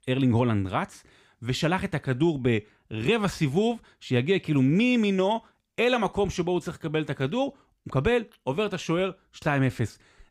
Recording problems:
none

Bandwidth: 15.5 kHz